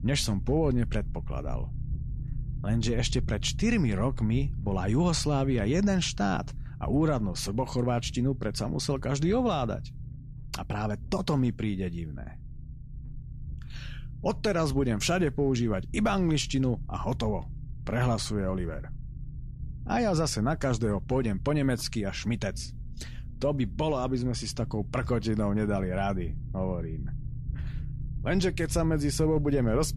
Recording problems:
low rumble; faint; throughout; 20 dB below the speech

